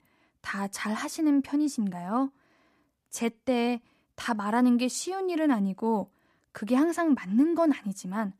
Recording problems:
none

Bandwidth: 14.5 kHz